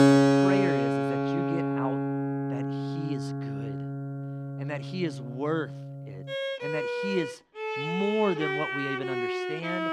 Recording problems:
background music; very loud; throughout; 4 dB above the speech

